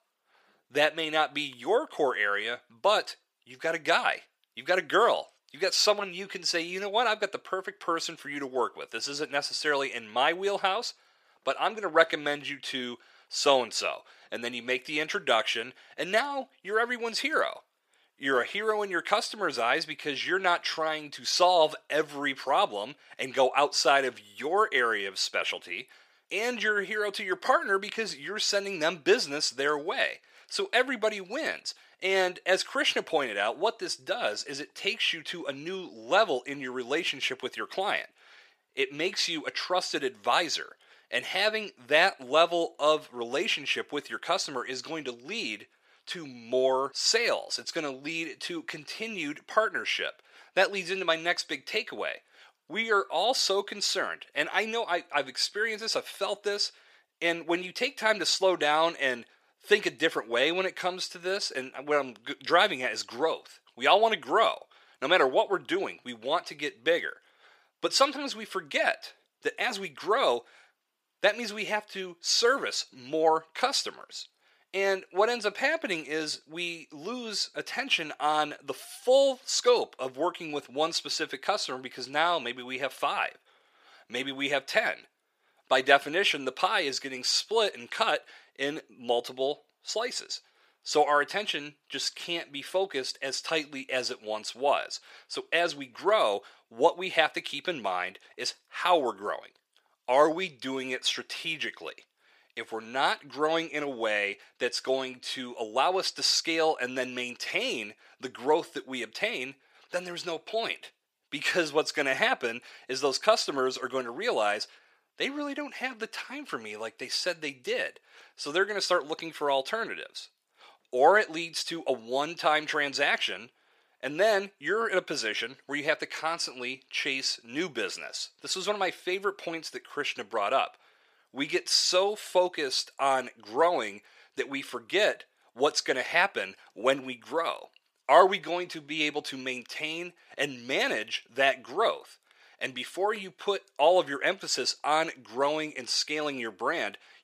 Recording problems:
thin; somewhat; fading below 500 Hz

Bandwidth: 15 kHz